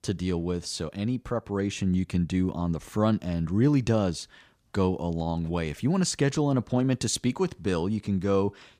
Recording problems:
none

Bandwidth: 15 kHz